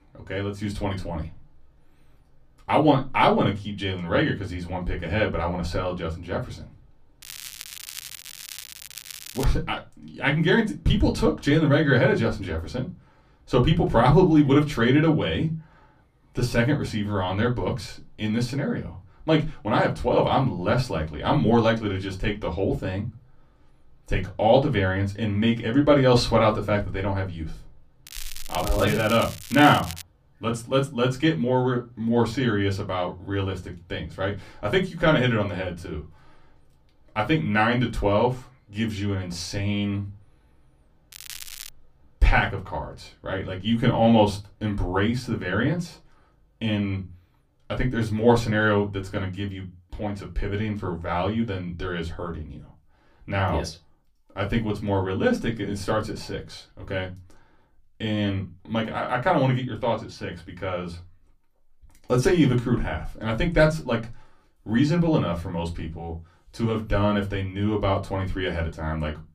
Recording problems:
room echo; very slight; dies away in 0.2 s
off-mic speech; somewhat distant
crackling; noticeable; from 7 to 9.5 s, from 28 to 30 s and at 41 s; 15 dB below the speech

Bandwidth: 15 kHz